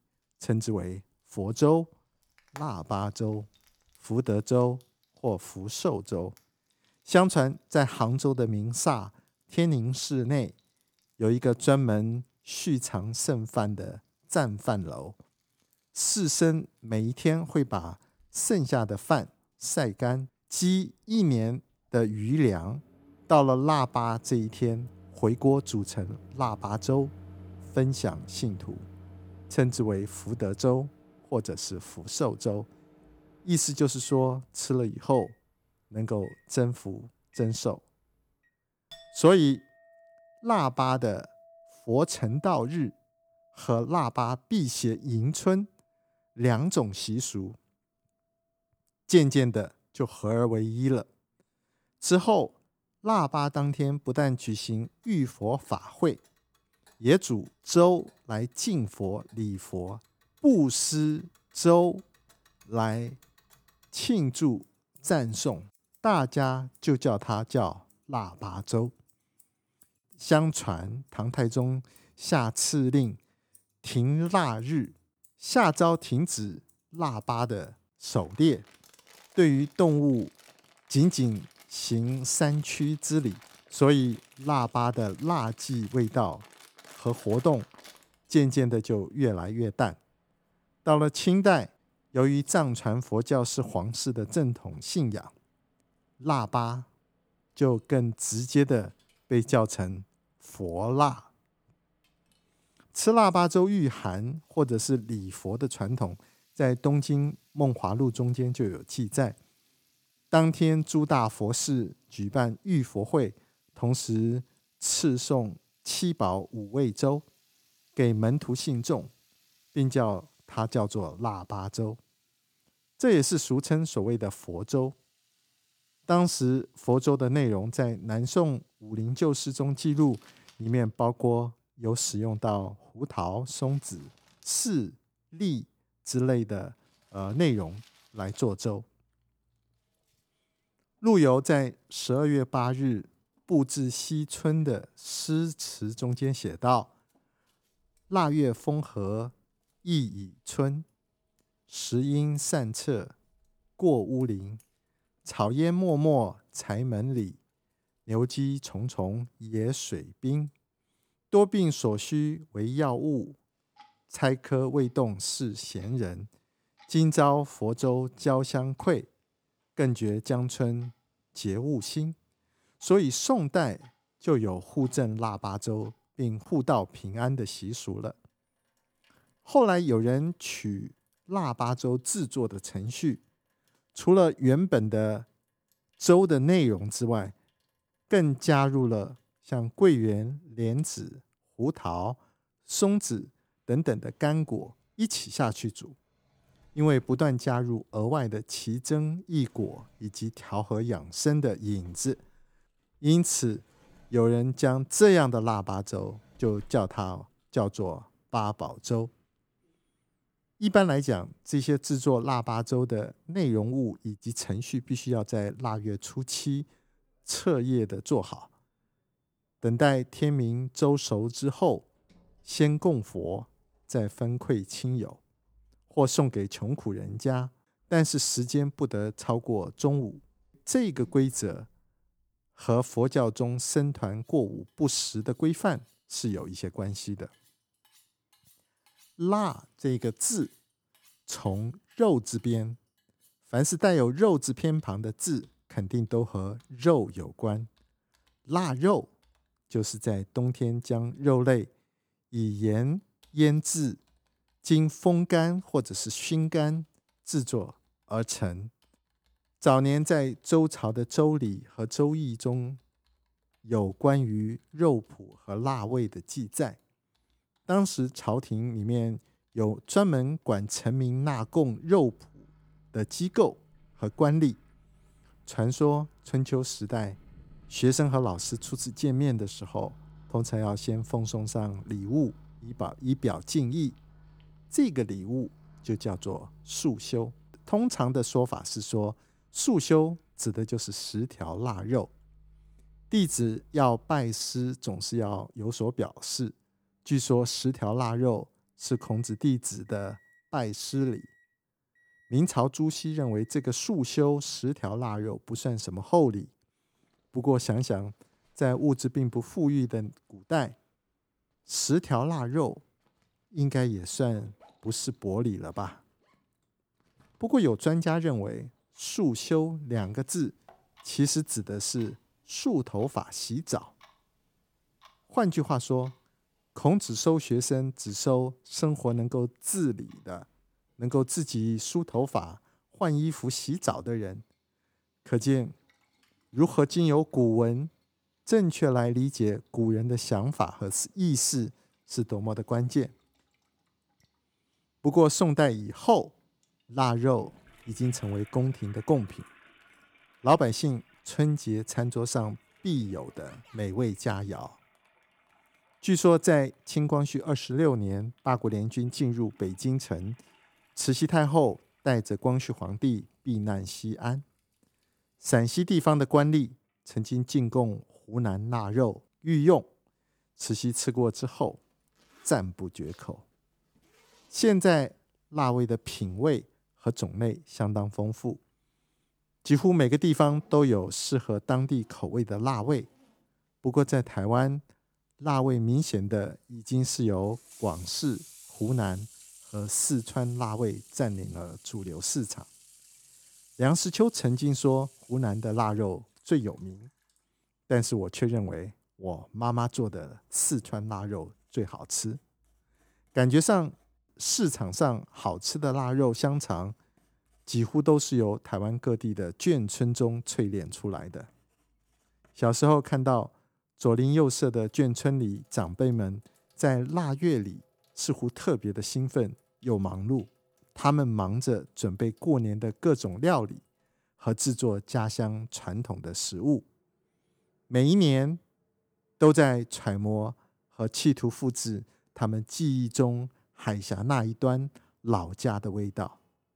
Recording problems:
household noises; faint; throughout; 30 dB below the speech

